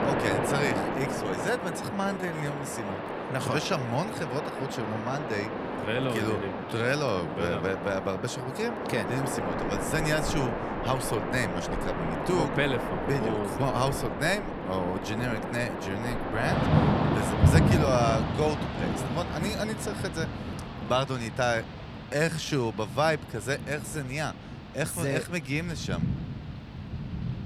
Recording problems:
rain or running water; loud; throughout; 1 dB below the speech
uneven, jittery; slightly; from 2 to 26 s

